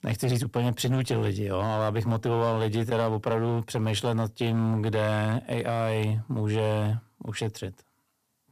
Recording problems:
distortion; slight; 6% of the sound clipped

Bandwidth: 14.5 kHz